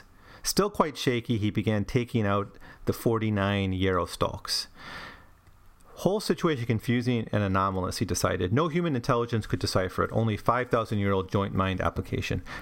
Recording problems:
squashed, flat; somewhat

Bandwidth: 16 kHz